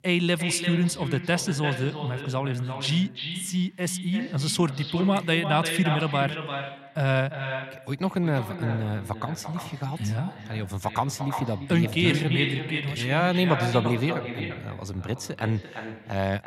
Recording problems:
echo of what is said; strong; throughout; 340 ms later, 7 dB below the speech

